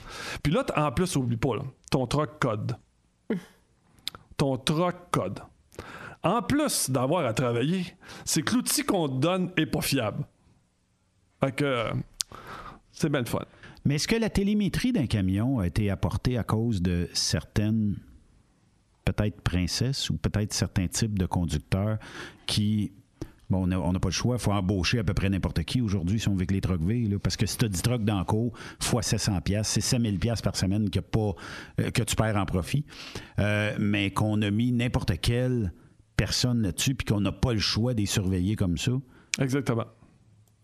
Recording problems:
squashed, flat; heavily

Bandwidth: 13.5 kHz